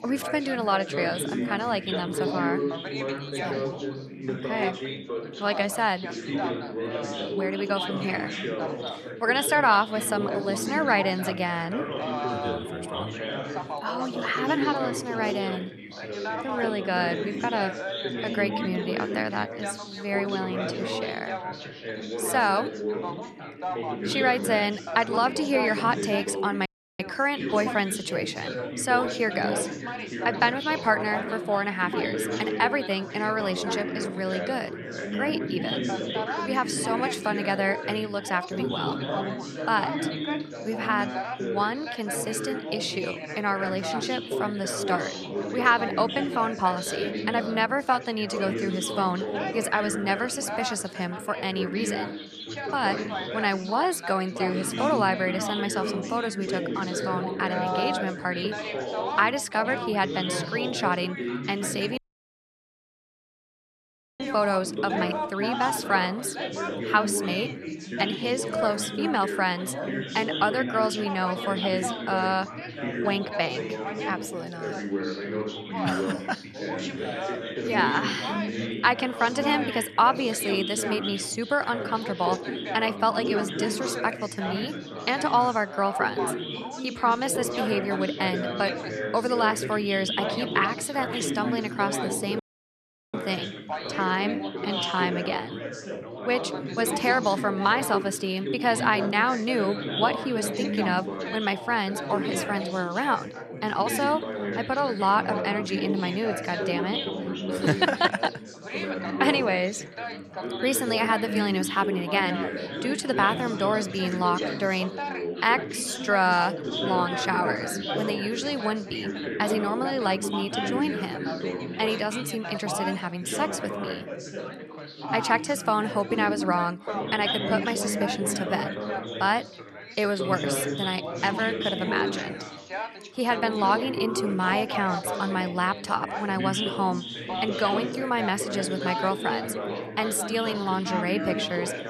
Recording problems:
chatter from many people; loud; throughout; 4 dB below the speech
audio cutting out; at 27 s, at 1:02 for 2 s and at 1:32 for 0.5 s

